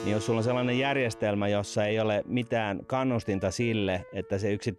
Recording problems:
background music; noticeable; throughout; 15 dB below the speech

